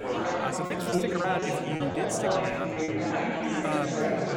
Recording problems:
chatter from many people; very loud; throughout; 5 dB above the speech
choppy; very; from 0.5 to 2.5 s; 9% of the speech affected

